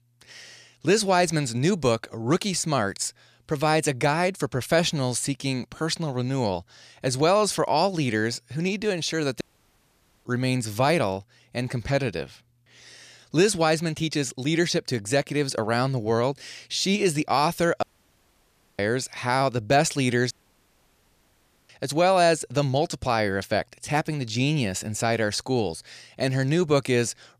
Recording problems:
audio cutting out; at 9.5 s for 1 s, at 18 s for 1 s and at 20 s for 1.5 s

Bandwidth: 14.5 kHz